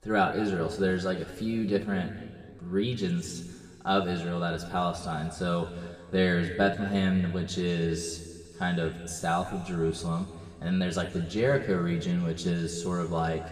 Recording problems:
room echo; slight; dies away in 1.9 s
off-mic speech; somewhat distant

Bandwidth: 14.5 kHz